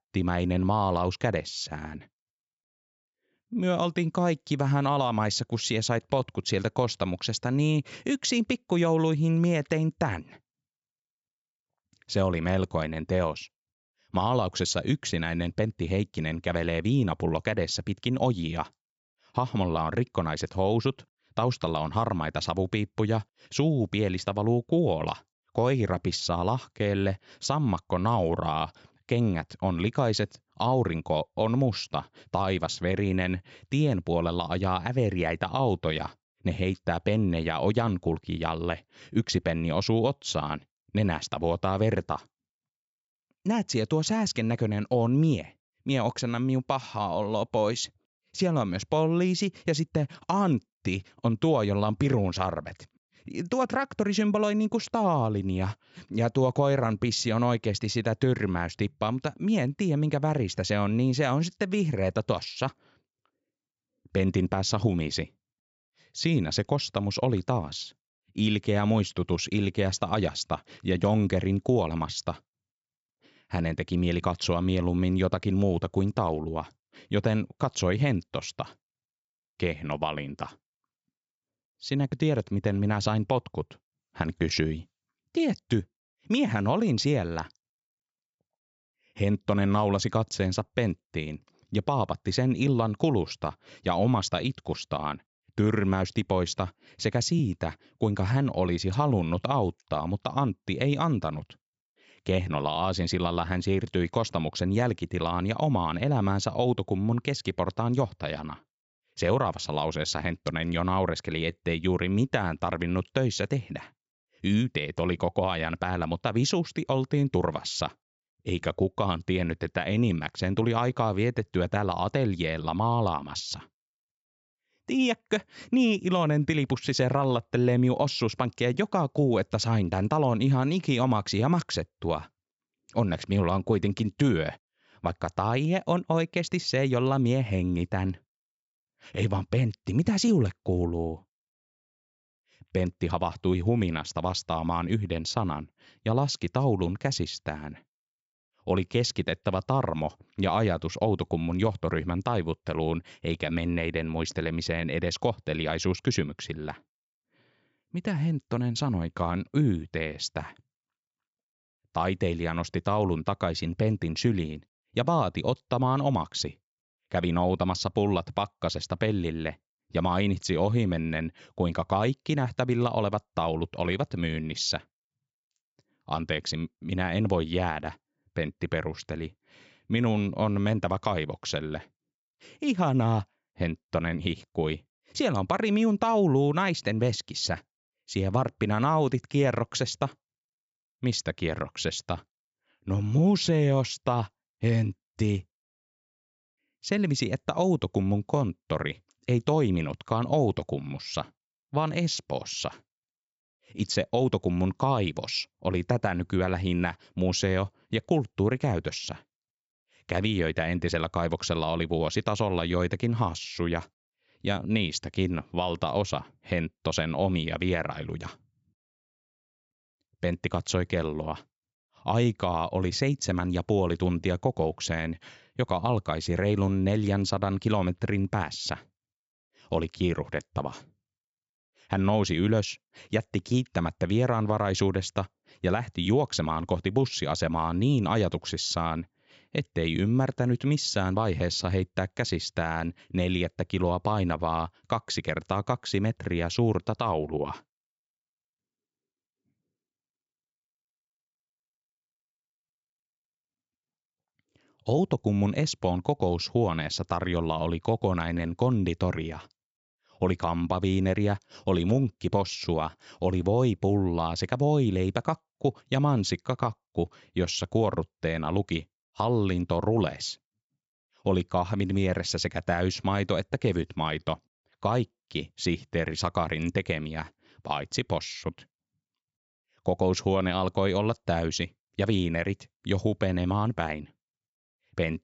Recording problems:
high frequencies cut off; noticeable; nothing above 8 kHz

